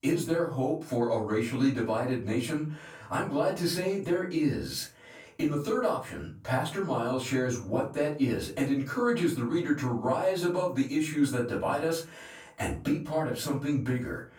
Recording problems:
off-mic speech; far
room echo; slight; dies away in 0.3 s

